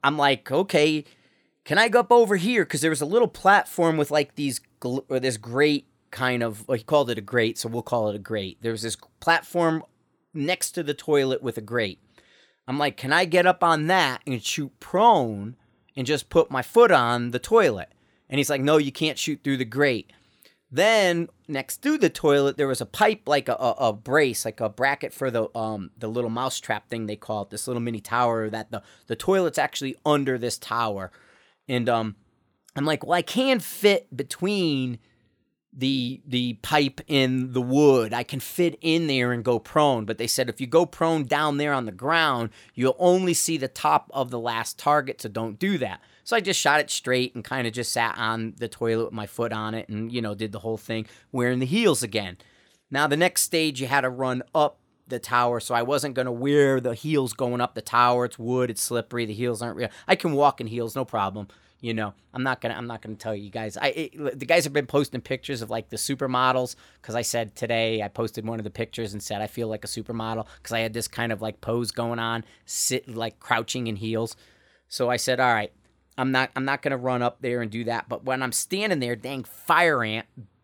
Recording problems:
none

